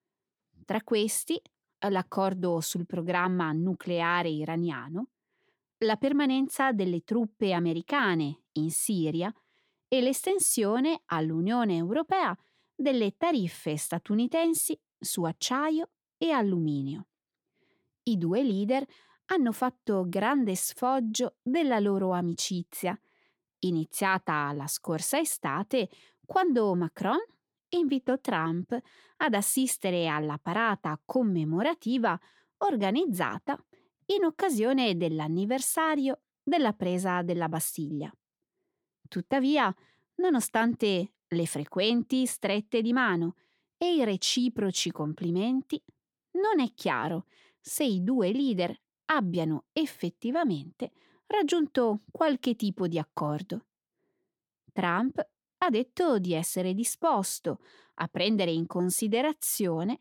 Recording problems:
none

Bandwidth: 18.5 kHz